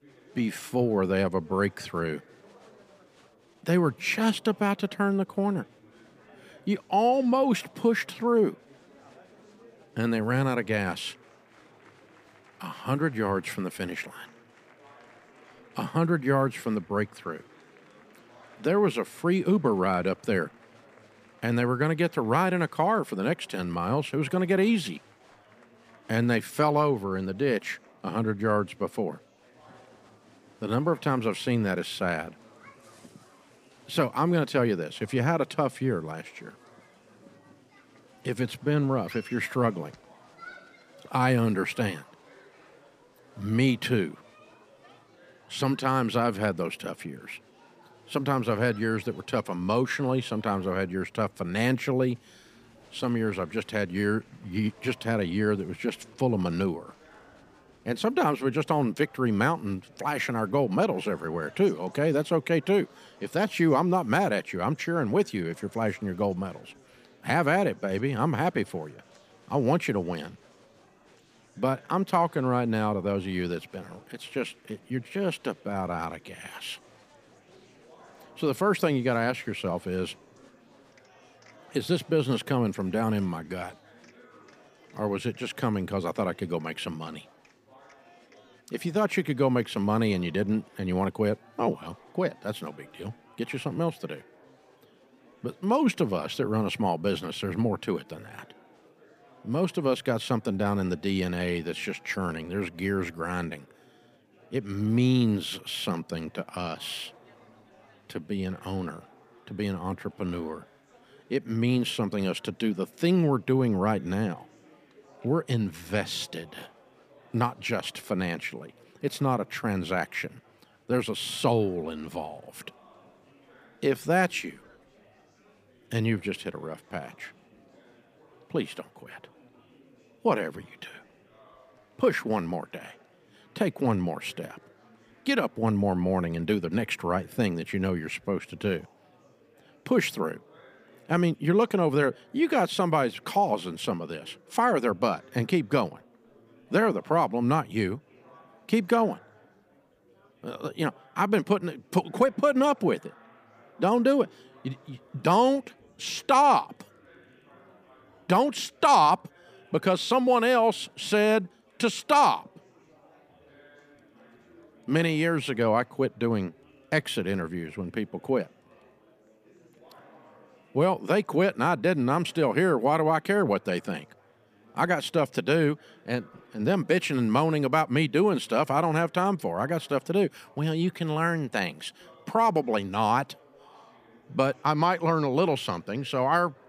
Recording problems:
murmuring crowd; faint; throughout; 30 dB below the speech

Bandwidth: 15 kHz